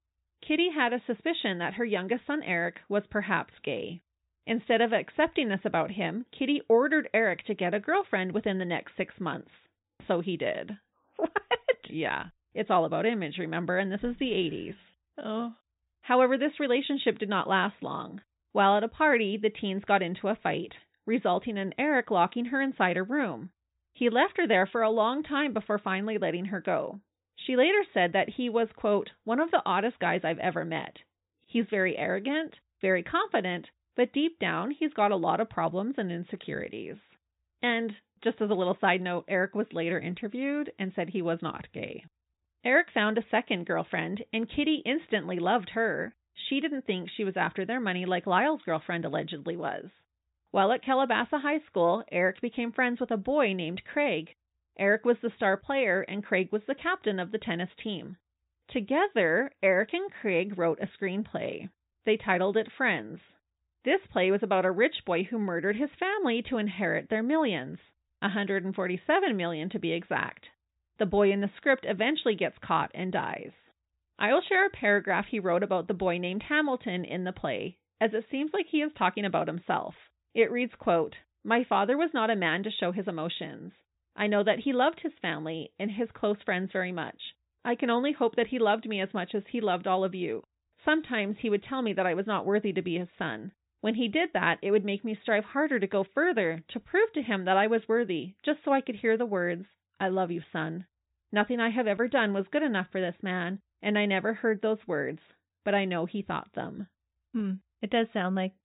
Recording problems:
high frequencies cut off; severe; nothing above 4 kHz

